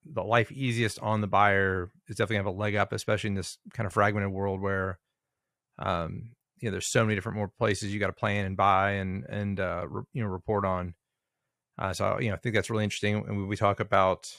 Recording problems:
none

